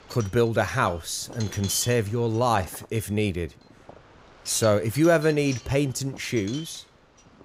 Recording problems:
wind noise on the microphone; occasional gusts; 15 dB below the speech

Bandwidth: 15.5 kHz